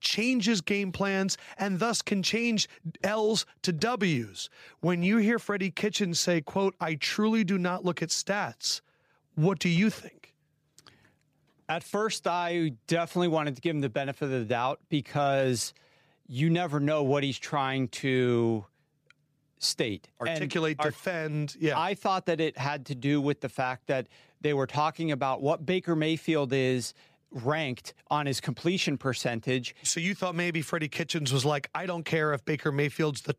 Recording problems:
none

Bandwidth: 15 kHz